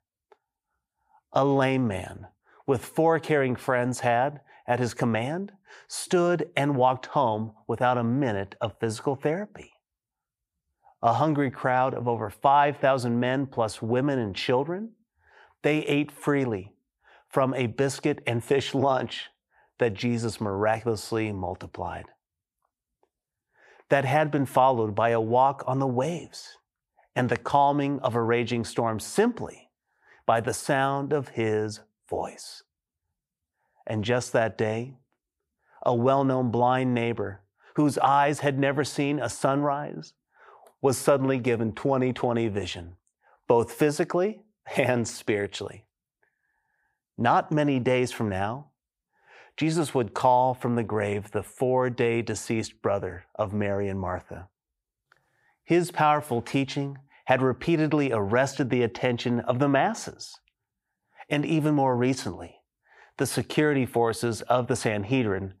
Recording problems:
none

